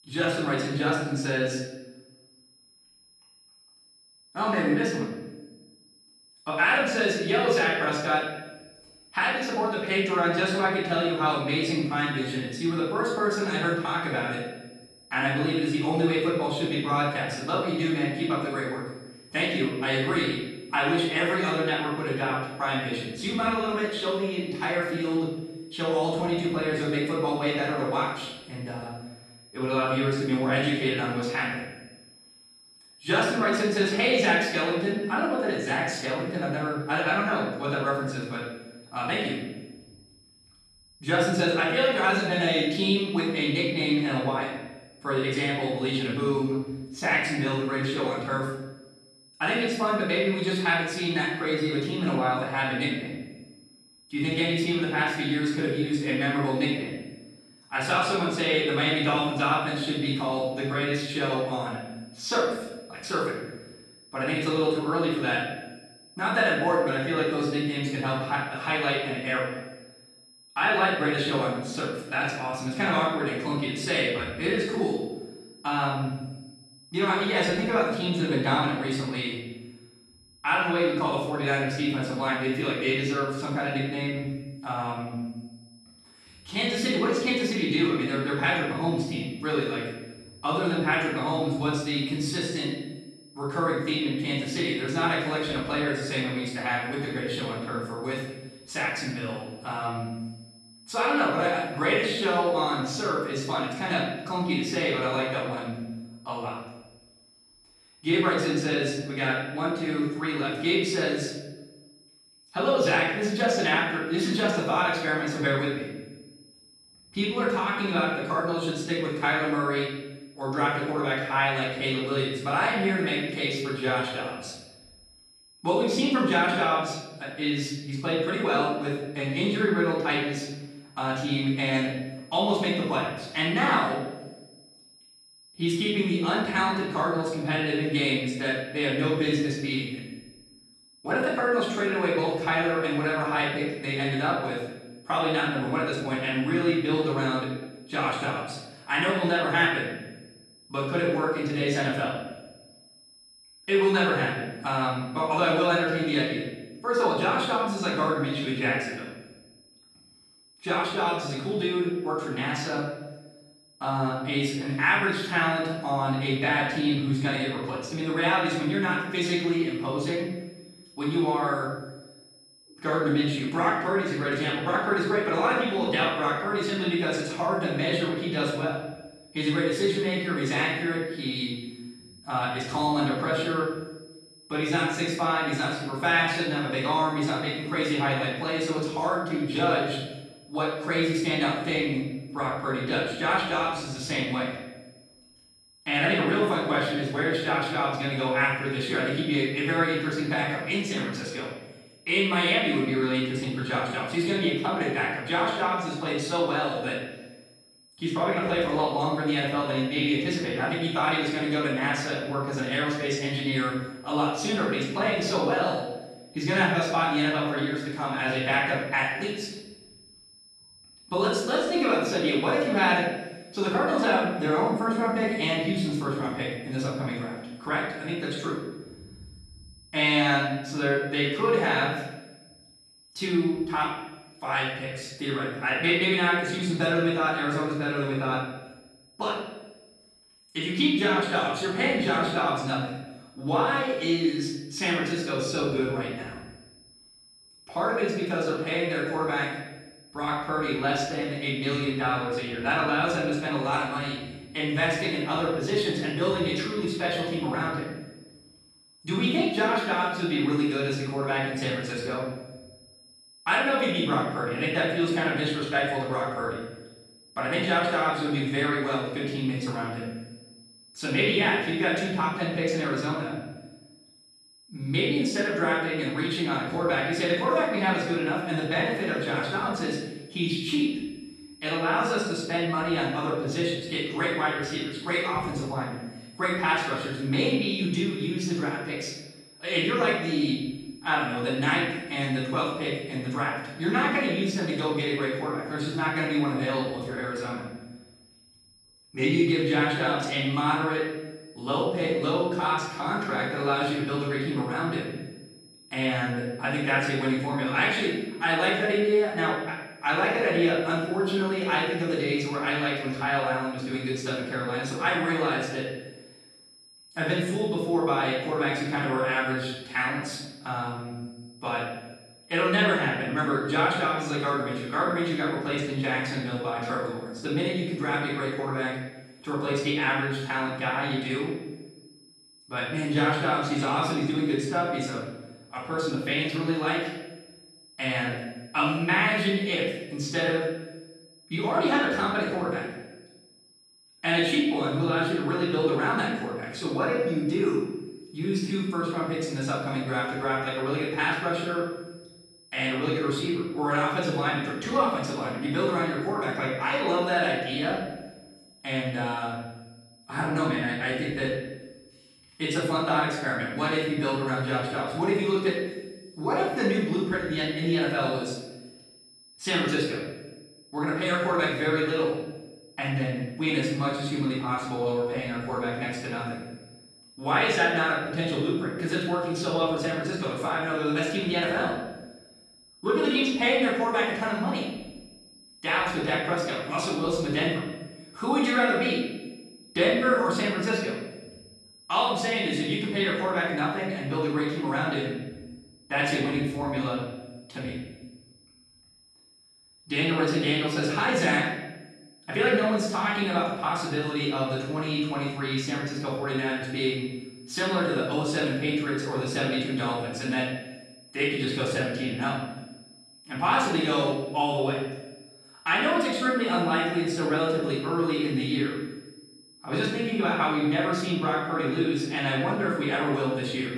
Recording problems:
off-mic speech; far
room echo; noticeable; dies away in 0.9 s
high-pitched whine; faint; throughout; 5 kHz, 25 dB below the speech

